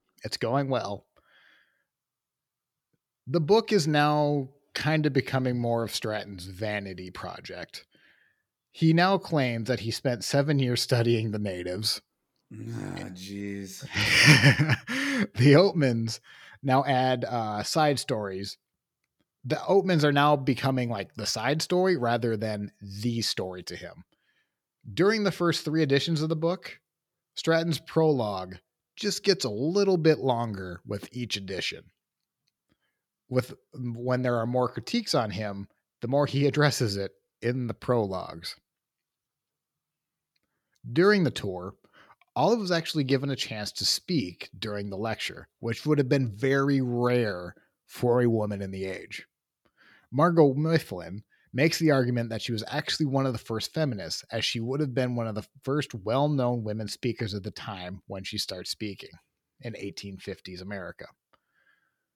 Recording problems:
none

